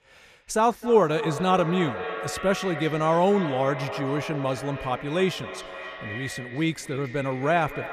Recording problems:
echo of what is said; strong; throughout; 260 ms later, 10 dB below the speech

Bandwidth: 14.5 kHz